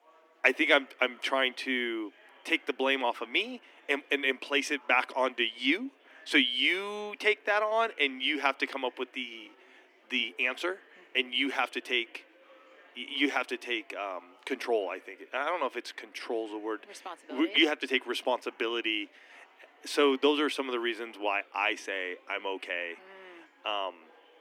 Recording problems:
thin; somewhat; fading below 250 Hz
murmuring crowd; faint; throughout; 30 dB below the speech

